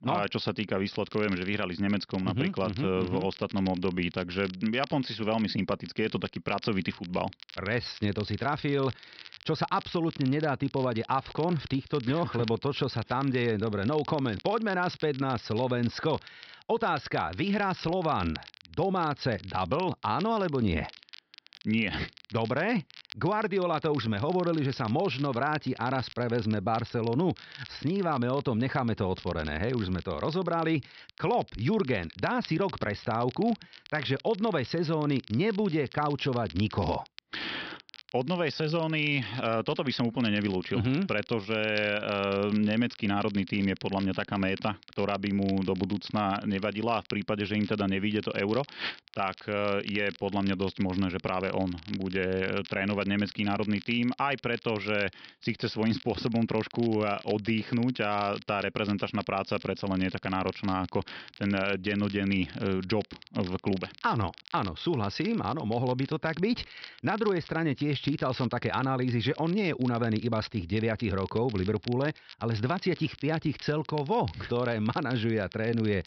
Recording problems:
high frequencies cut off; noticeable; nothing above 5.5 kHz
crackle, like an old record; noticeable; 20 dB below the speech

